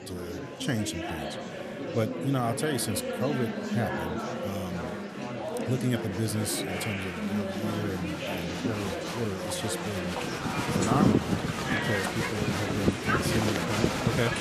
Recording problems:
animal sounds; very loud; throughout; 2 dB above the speech
murmuring crowd; very loud; throughout; as loud as the speech

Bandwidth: 14 kHz